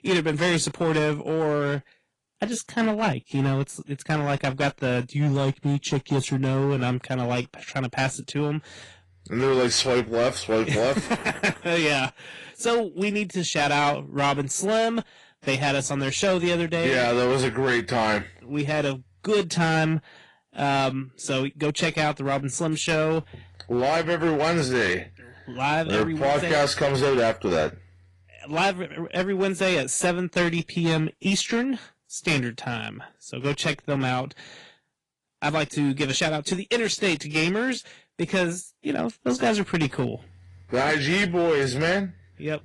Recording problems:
distortion; slight; 8% of the sound clipped
garbled, watery; slightly; nothing above 10.5 kHz

